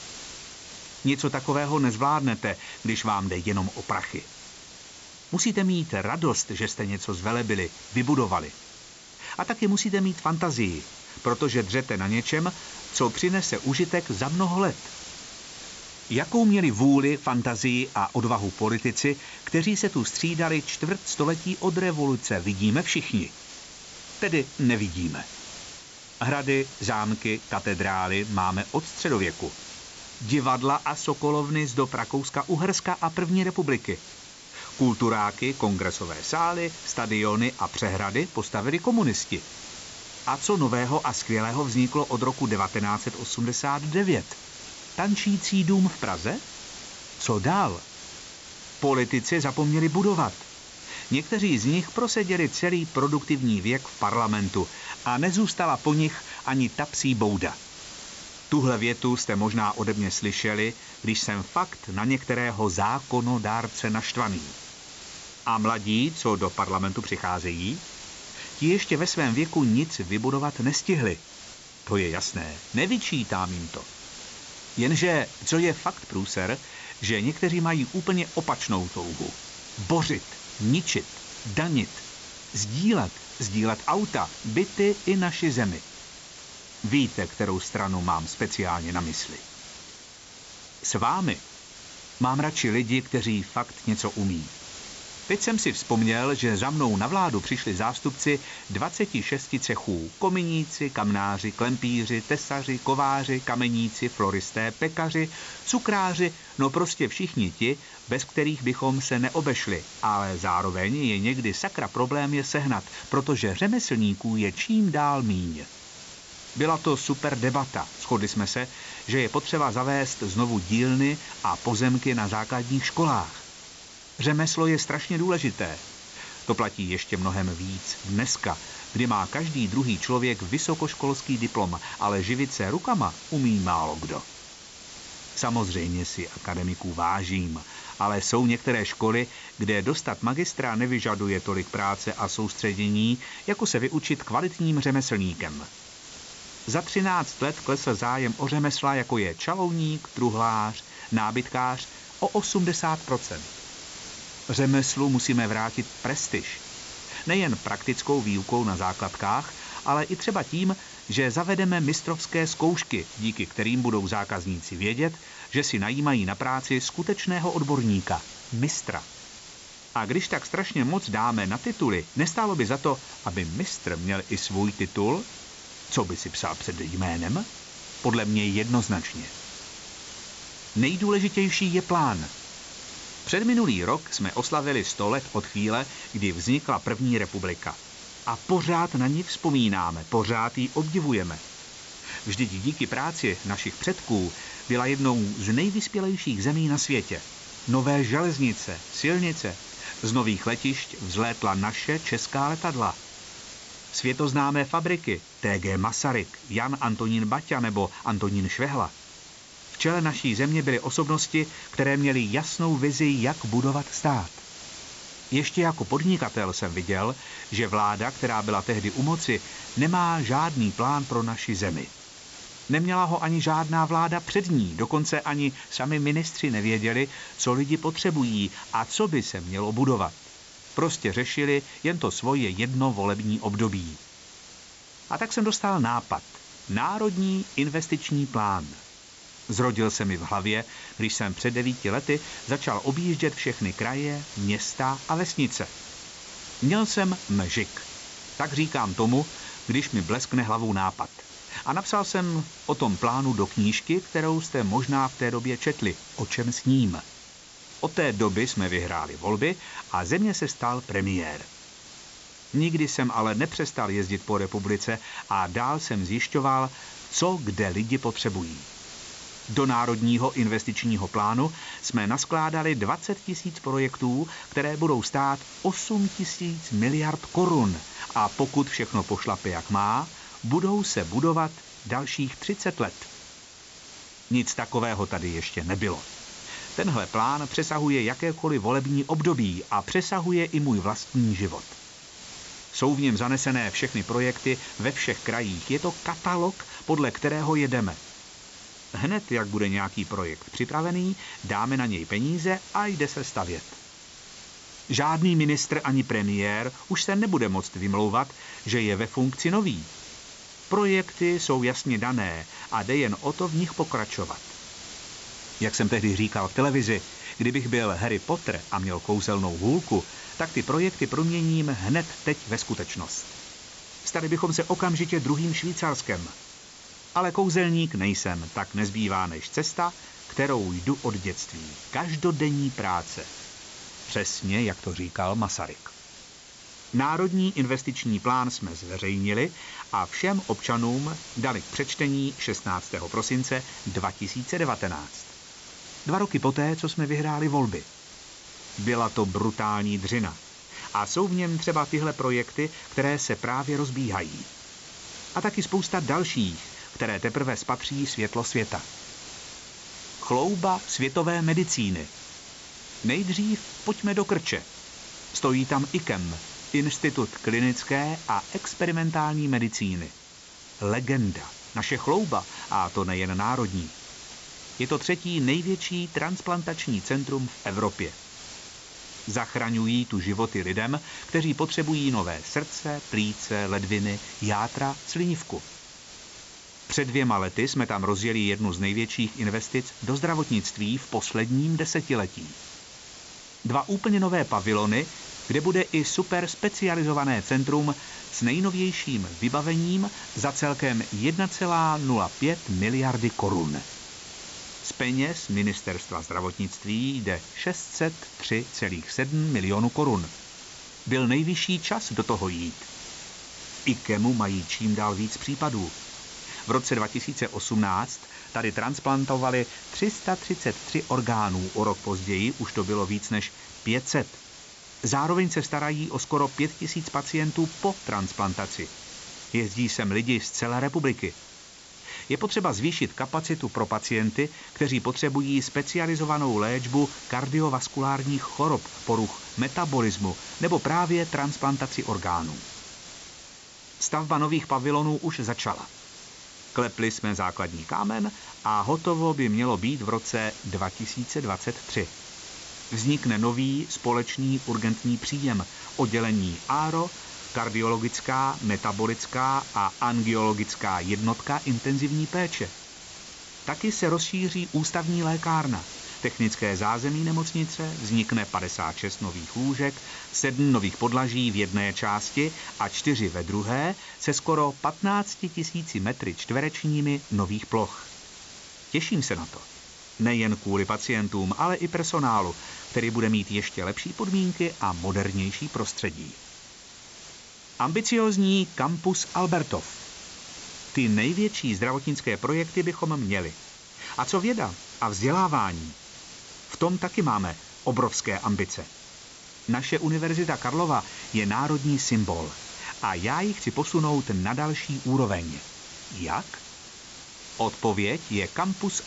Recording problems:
high frequencies cut off; noticeable; nothing above 8 kHz
hiss; noticeable; throughout; 15 dB below the speech

